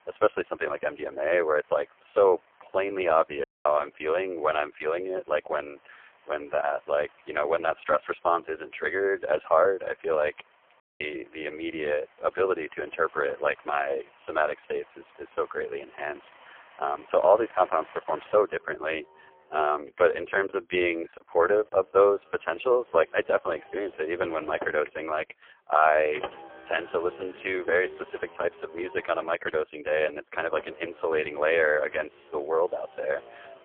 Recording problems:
phone-call audio; poor line; nothing above 3.5 kHz
traffic noise; faint; throughout; 20 dB below the speech
audio cutting out; at 3.5 s and at 11 s
choppy; very; from 20 to 22 s; 6% of the speech affected

